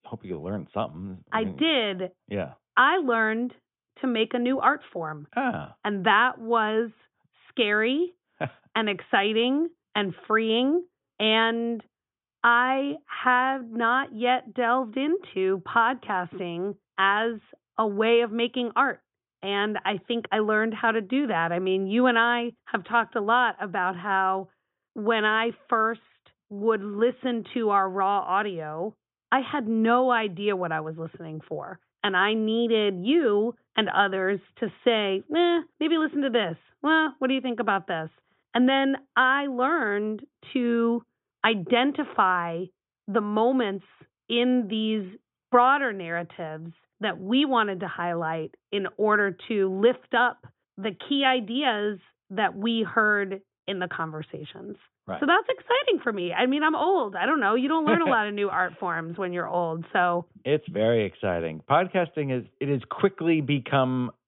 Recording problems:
high frequencies cut off; severe; nothing above 3.5 kHz

